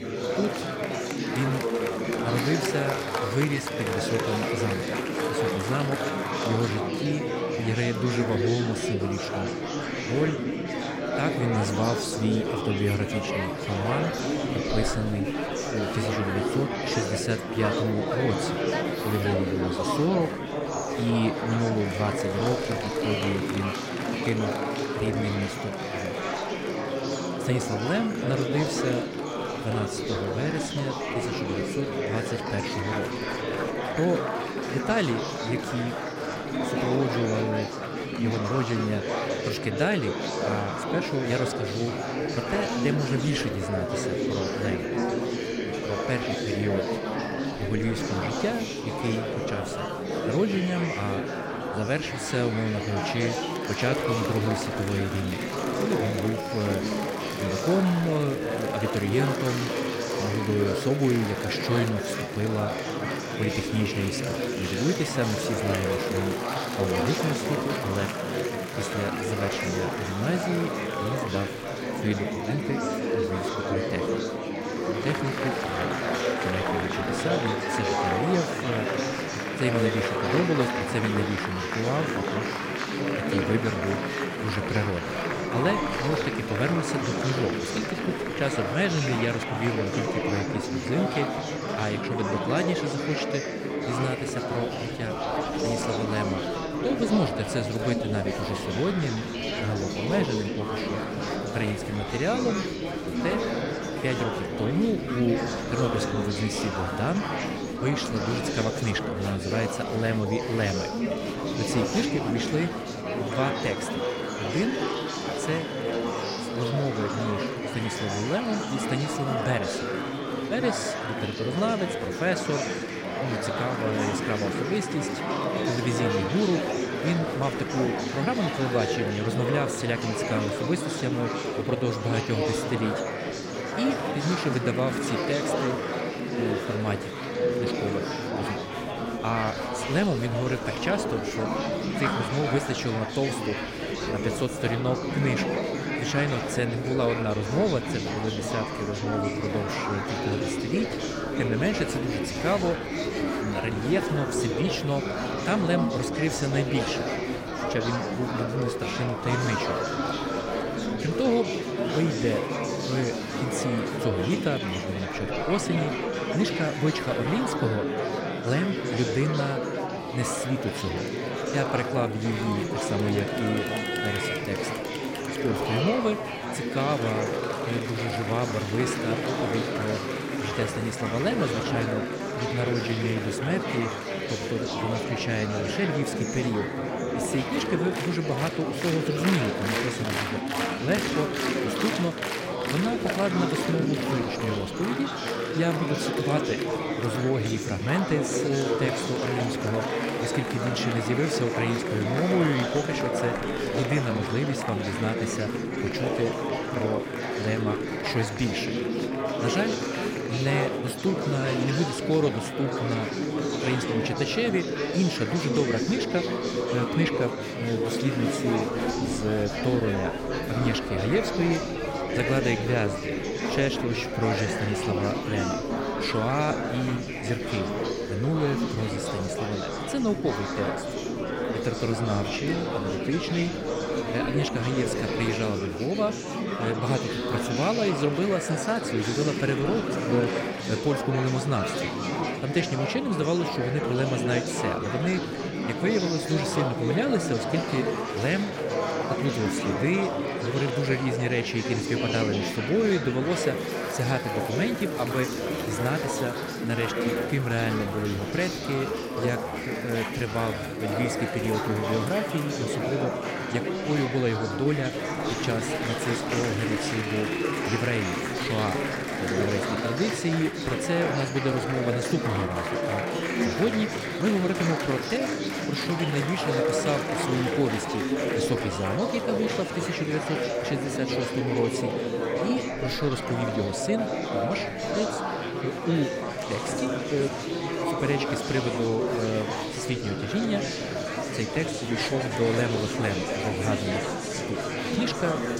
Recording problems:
murmuring crowd; very loud; throughout; as loud as the speech

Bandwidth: 16 kHz